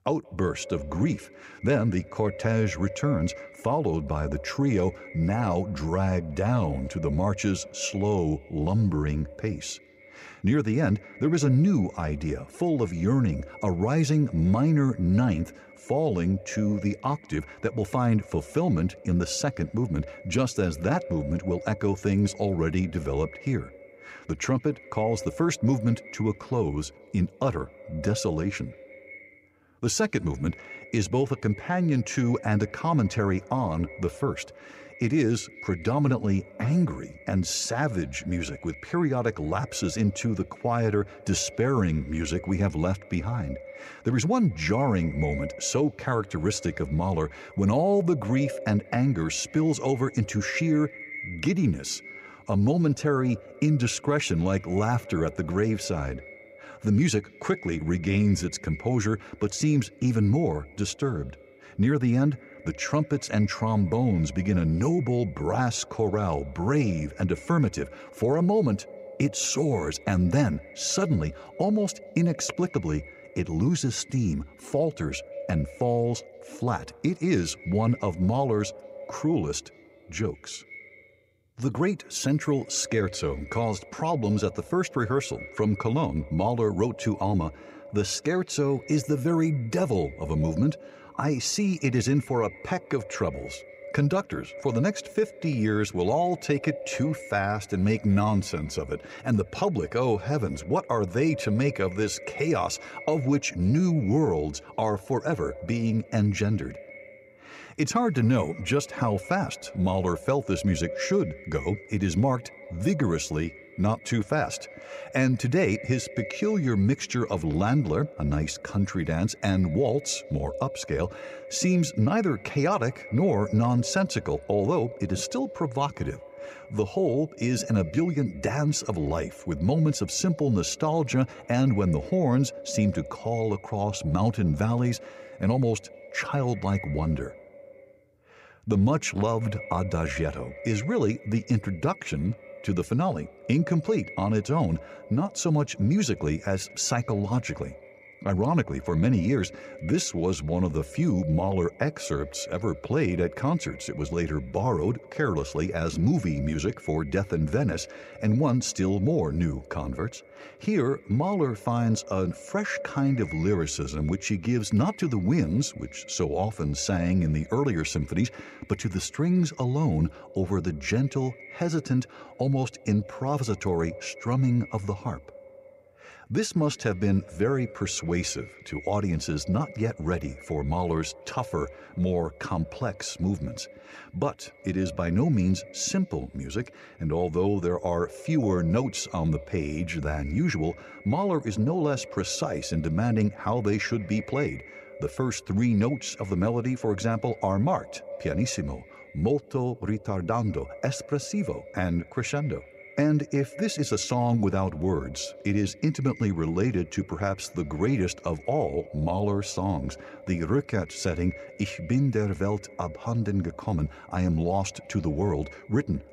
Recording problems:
echo of what is said; noticeable; throughout; 180 ms later, 15 dB below the speech

